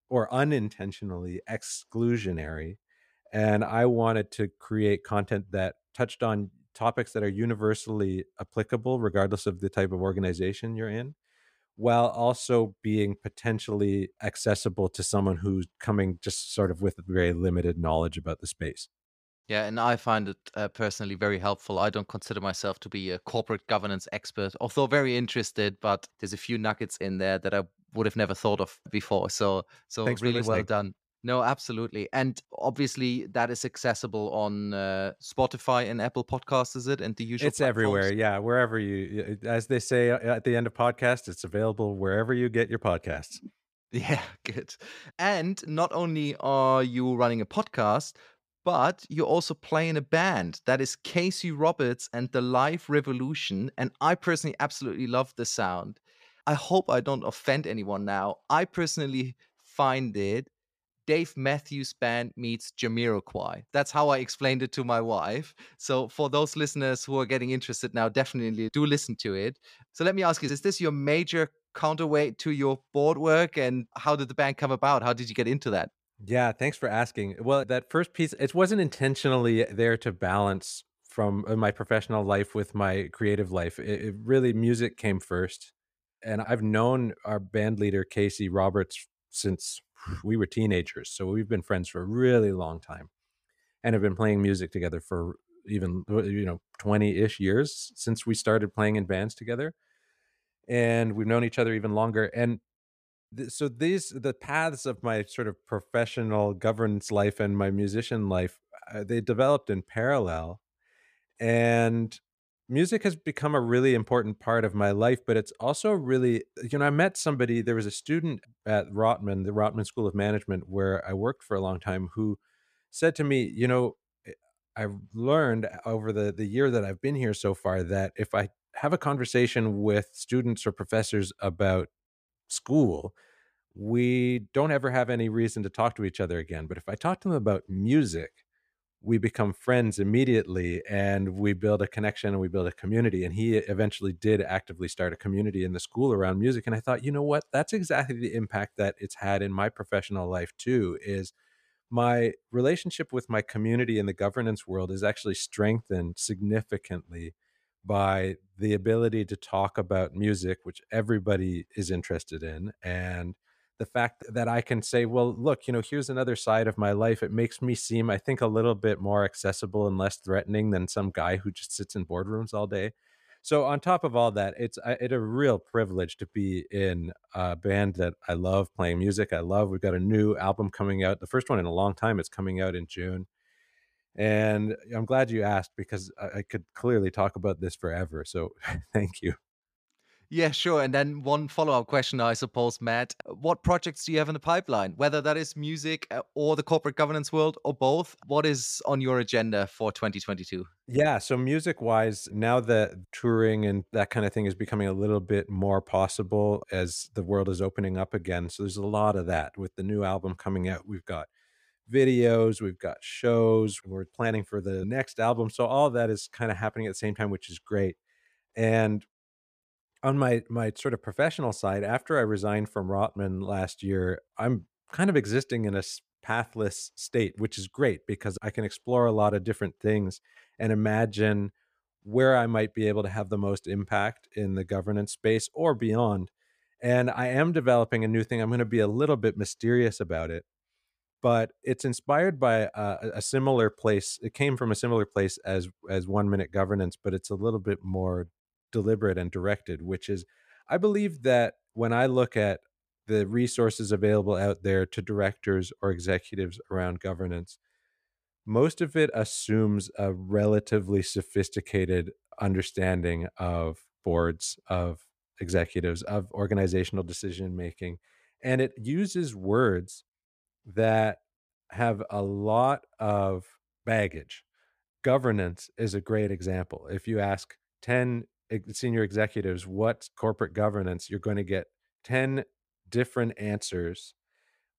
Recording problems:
none

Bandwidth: 15 kHz